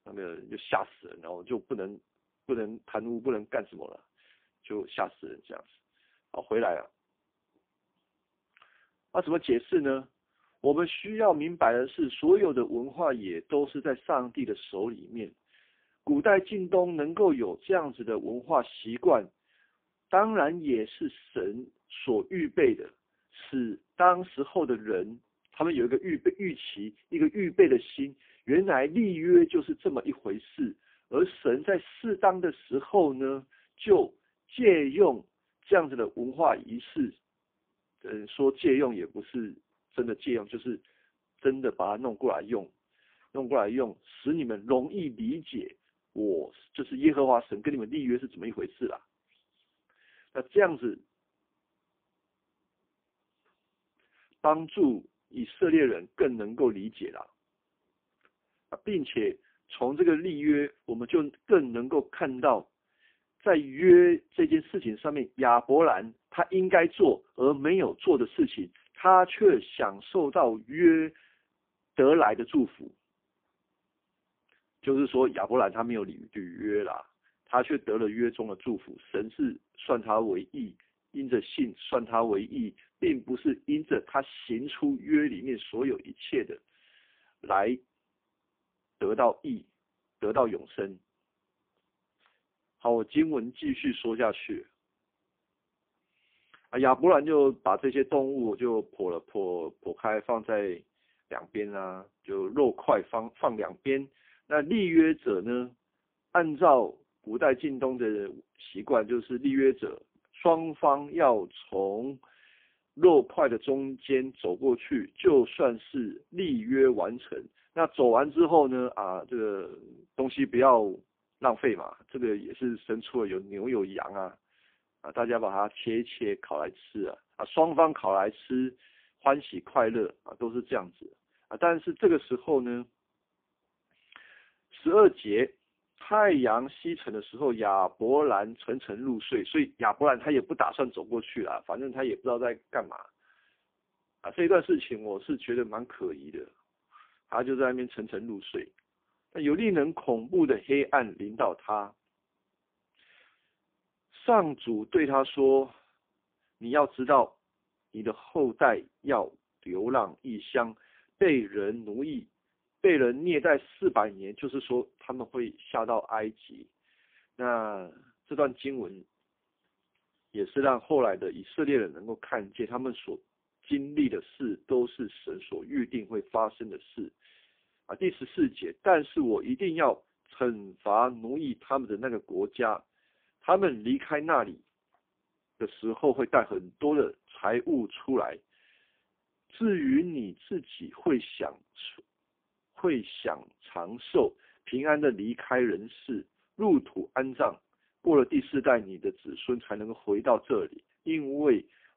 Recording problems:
phone-call audio; poor line

